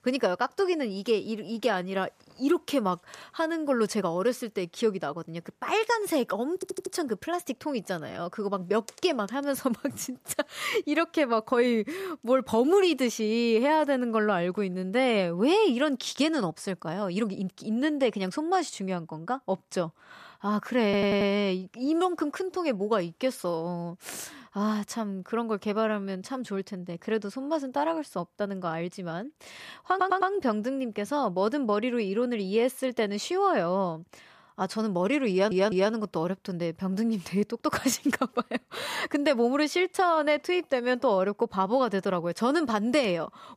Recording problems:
audio stuttering; 4 times, first at 6.5 s

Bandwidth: 14.5 kHz